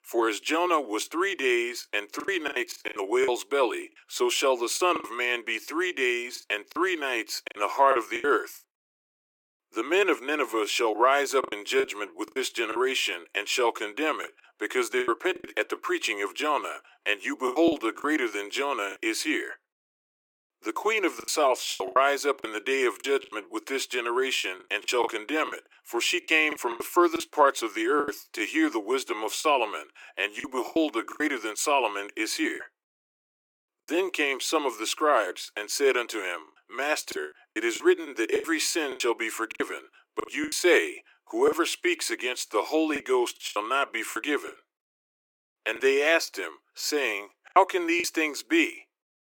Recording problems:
thin; very; fading below 350 Hz
choppy; very; 9% of the speech affected

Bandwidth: 17 kHz